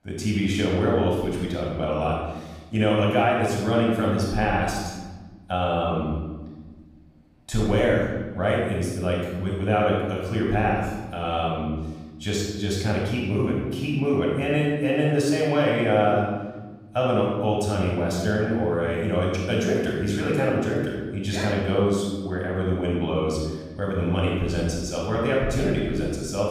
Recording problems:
off-mic speech; far
room echo; noticeable; dies away in 1.3 s

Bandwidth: 15.5 kHz